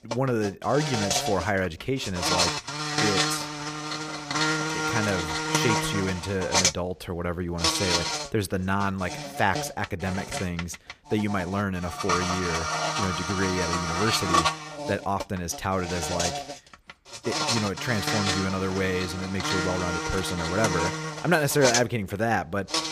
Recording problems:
animal sounds; very loud; throughout; 1 dB above the speech

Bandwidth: 15 kHz